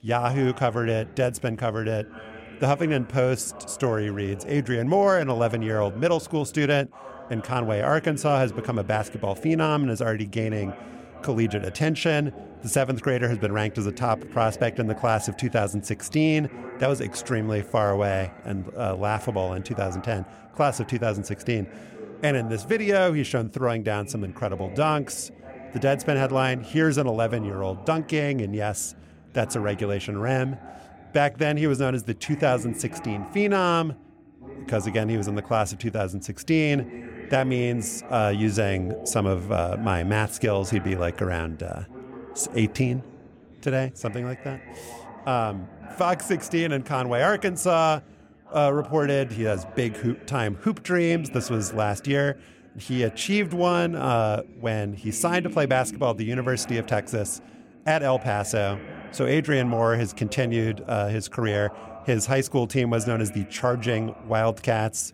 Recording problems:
background chatter; noticeable; throughout; 3 voices, 15 dB below the speech

